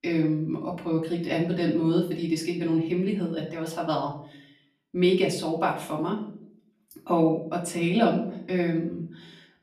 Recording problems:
off-mic speech; far
room echo; slight; dies away in 0.5 s

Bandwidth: 14.5 kHz